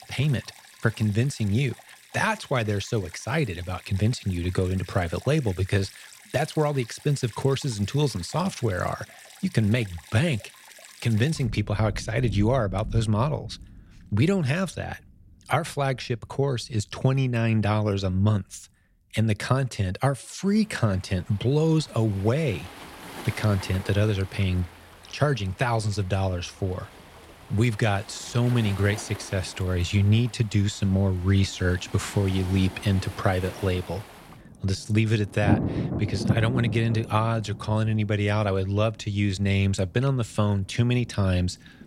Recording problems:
rain or running water; noticeable; throughout; 15 dB below the speech

